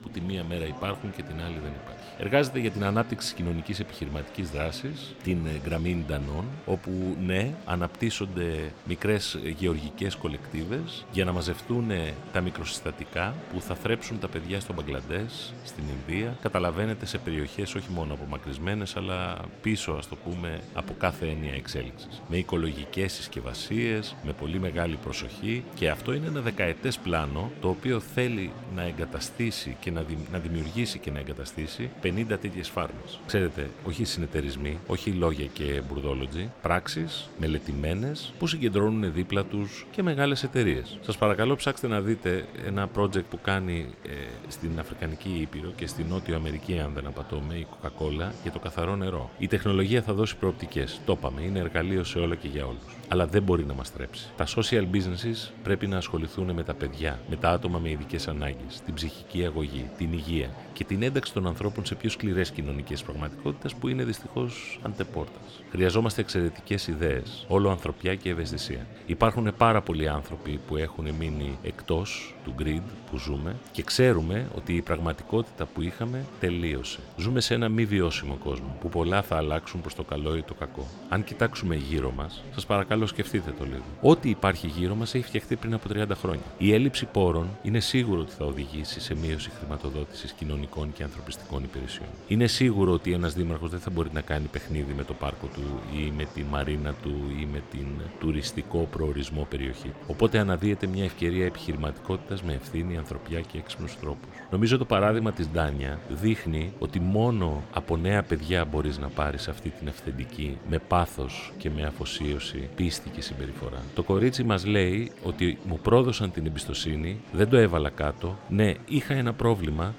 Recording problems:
murmuring crowd; noticeable; throughout; 15 dB below the speech

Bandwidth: 17.5 kHz